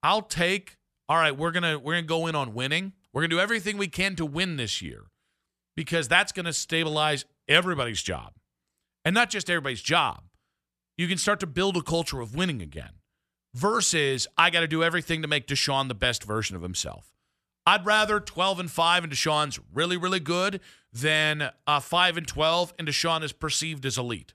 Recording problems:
none

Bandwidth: 14 kHz